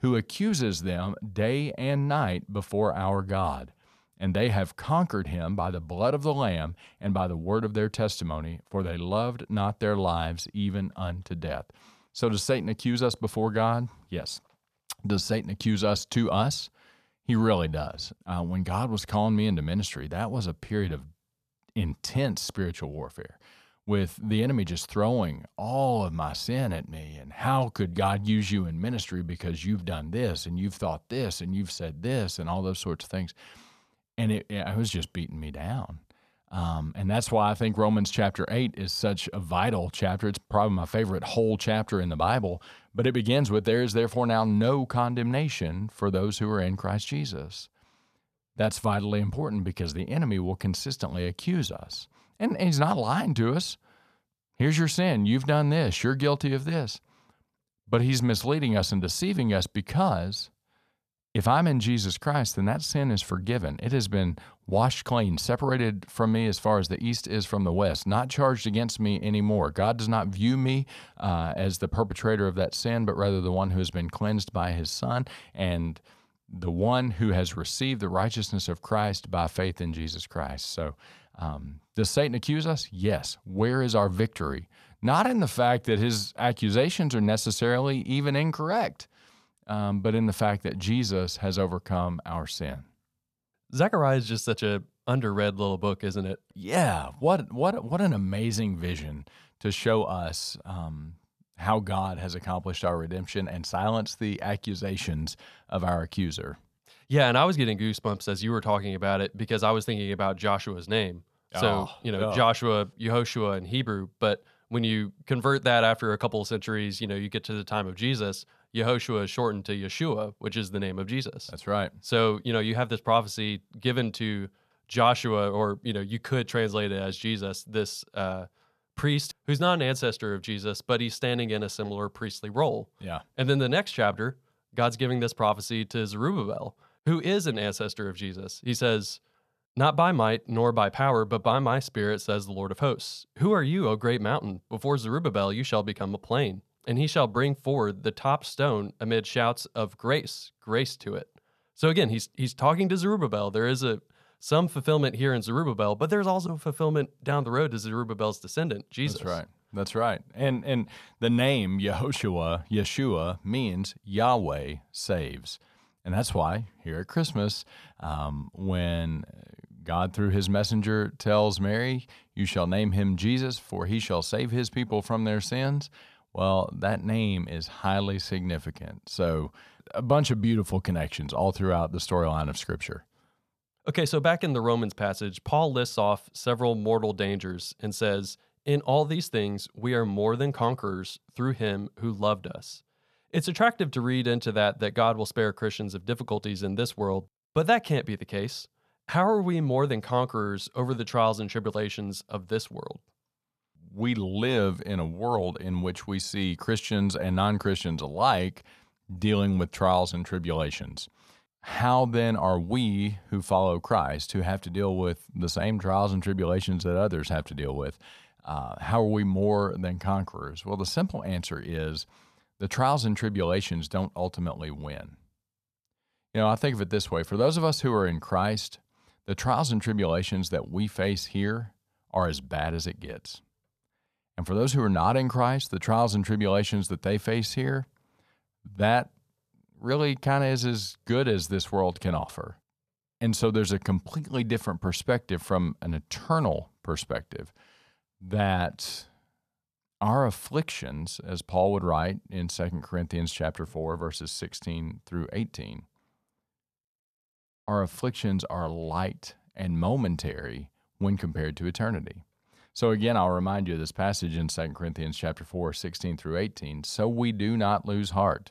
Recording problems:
none

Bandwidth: 14.5 kHz